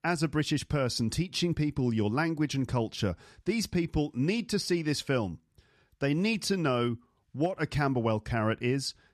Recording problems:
none

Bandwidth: 13.5 kHz